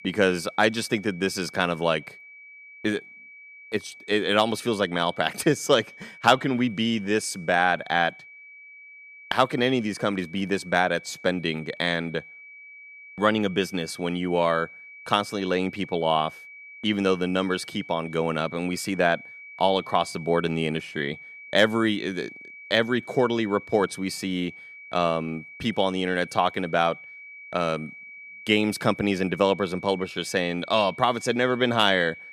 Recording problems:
high-pitched whine; noticeable; throughout; 2.5 kHz, 15 dB below the speech

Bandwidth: 14.5 kHz